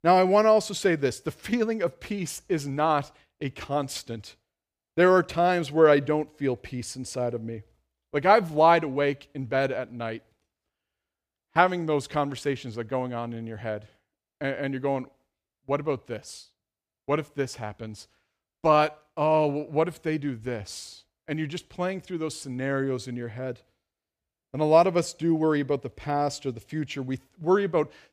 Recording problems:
none

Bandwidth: 15 kHz